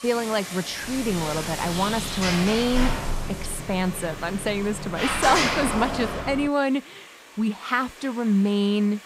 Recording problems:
rain or running water; noticeable; throughout; 15 dB below the speech
door banging; loud; from 1 to 6.5 s; peak 4 dB above the speech

